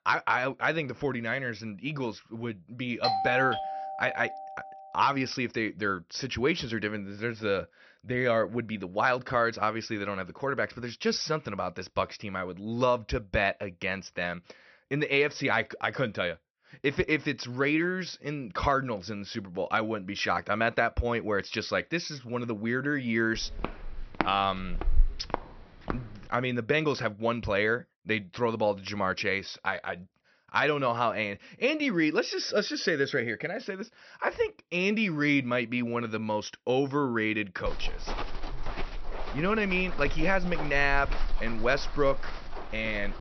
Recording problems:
high frequencies cut off; noticeable; nothing above 6 kHz
doorbell; loud; from 3 to 4.5 s; peak 1 dB above the speech
footsteps; noticeable; from 23 to 26 s and from 38 s on; peak 2 dB below the speech

